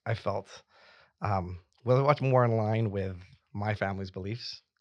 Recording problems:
none

